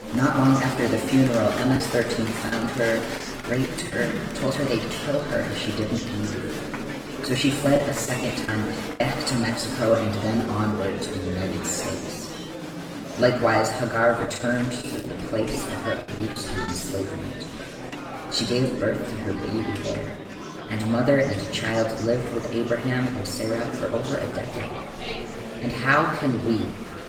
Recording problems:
off-mic speech; far
room echo; noticeable; dies away in 0.8 s
garbled, watery; slightly; nothing above 17 kHz
murmuring crowd; loud; throughout; 7 dB below the speech
crackling; faint; at 15 s; 25 dB below the speech
choppy; very; from 2 to 4 s, from 8 to 9 s and from 14 to 17 s; 8% of the speech affected

